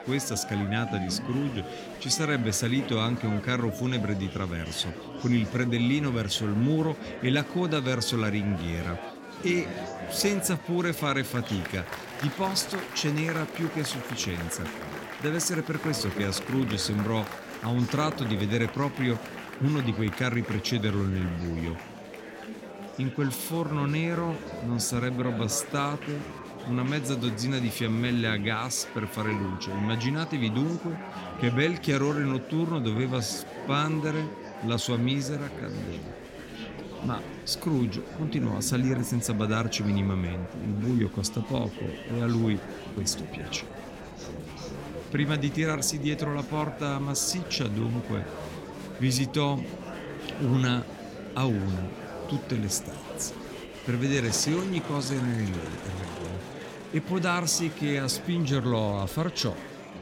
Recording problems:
murmuring crowd; loud; throughout; 10 dB below the speech

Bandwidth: 16.5 kHz